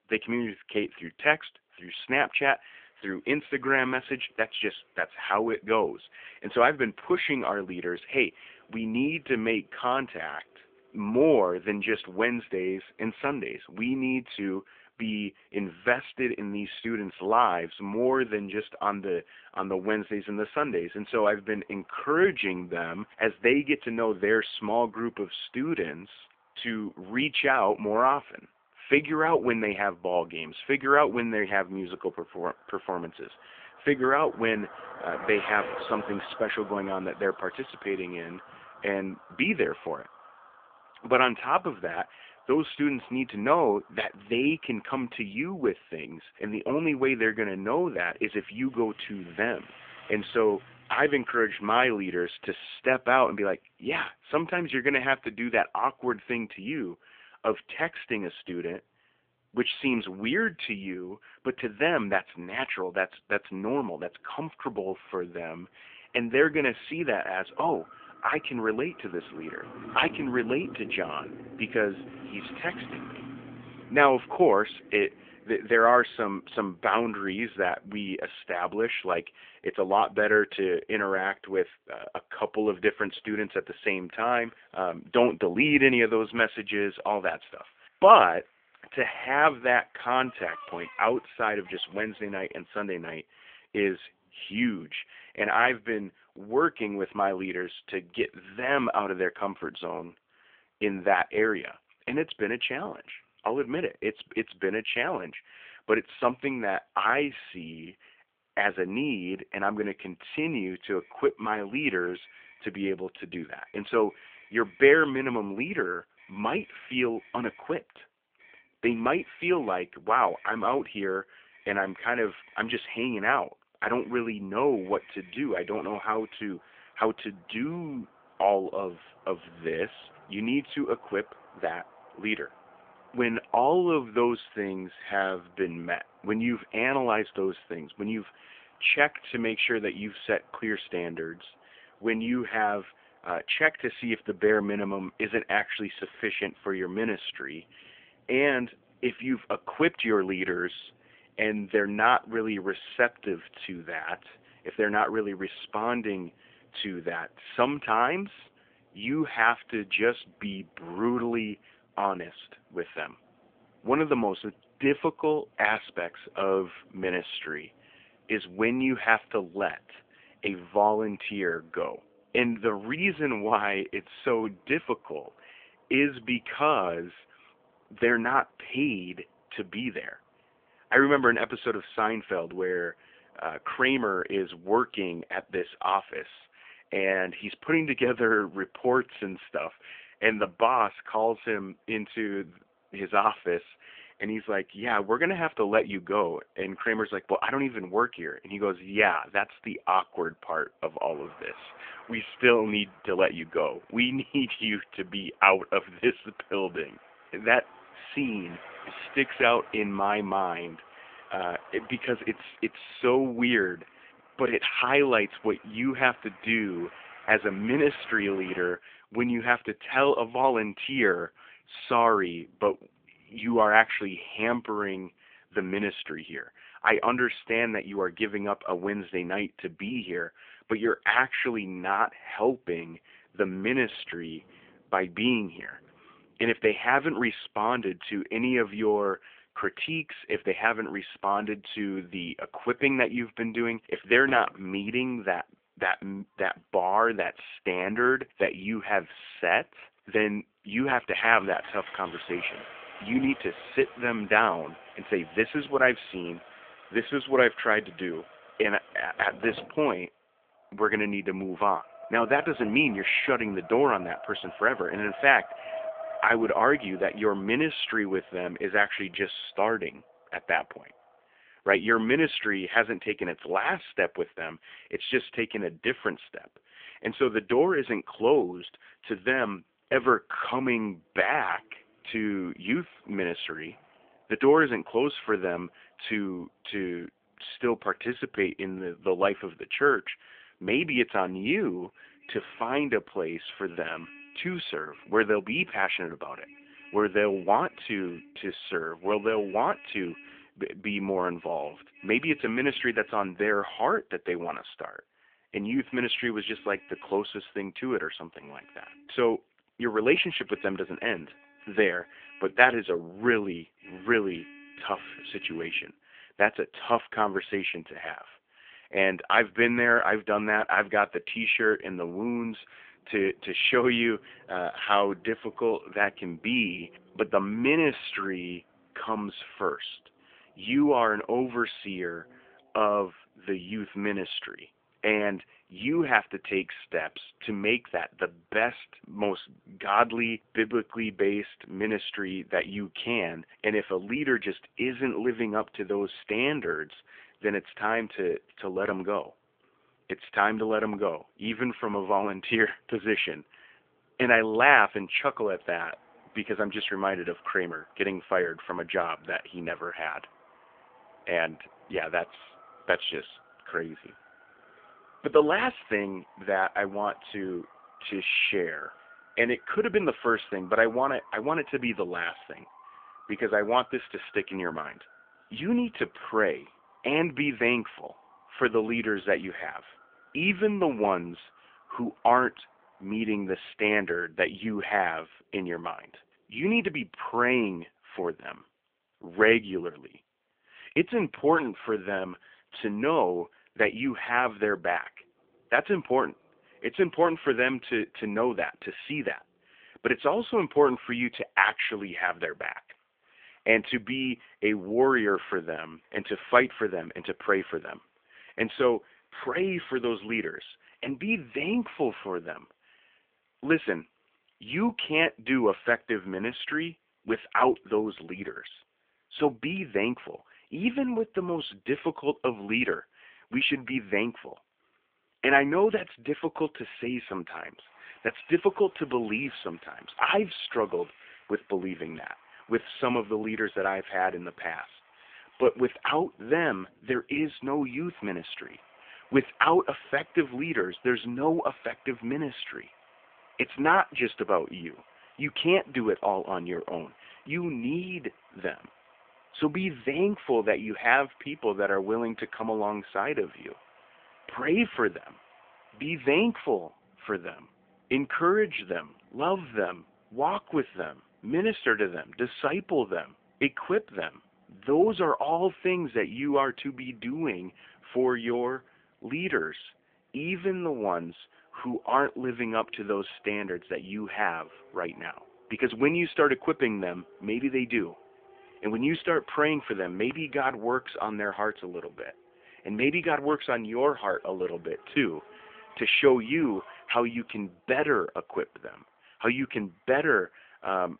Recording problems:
phone-call audio
traffic noise; faint; throughout; 20 dB below the speech

